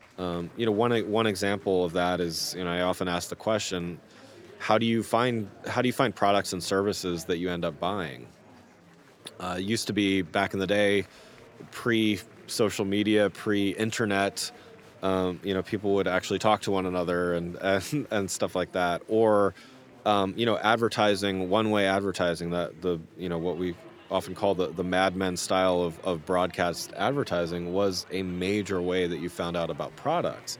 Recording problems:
murmuring crowd; faint; throughout; 25 dB below the speech

